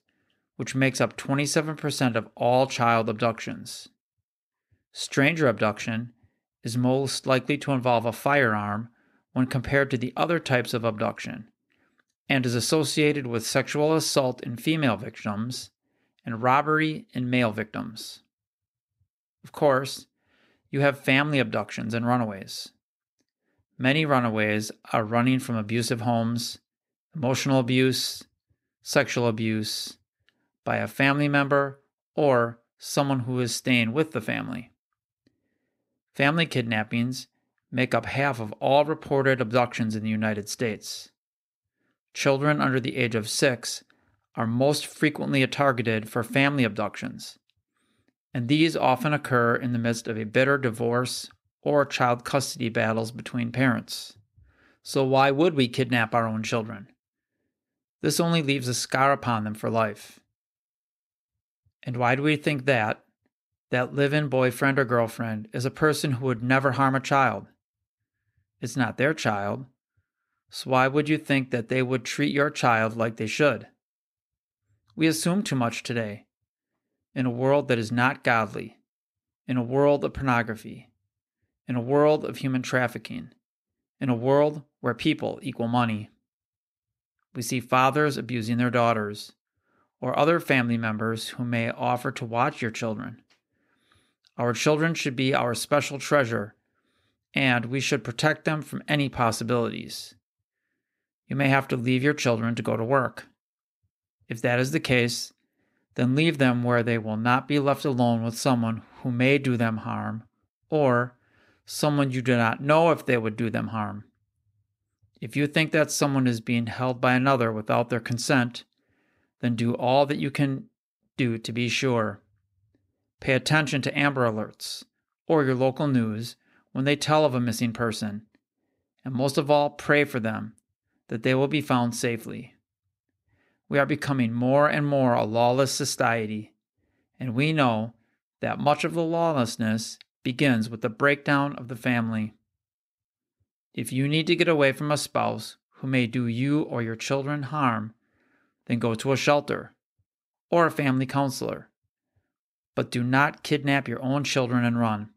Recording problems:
none

